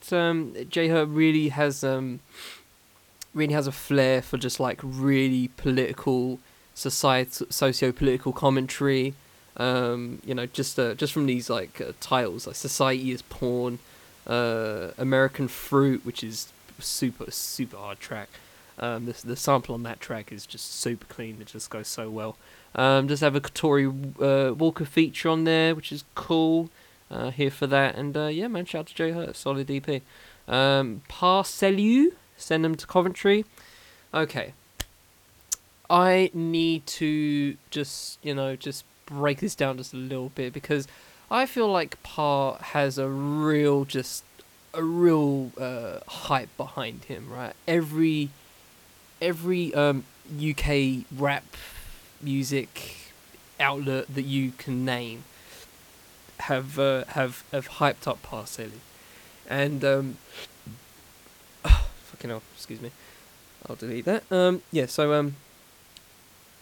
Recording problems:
hiss; faint; throughout; 25 dB below the speech

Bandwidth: 18.5 kHz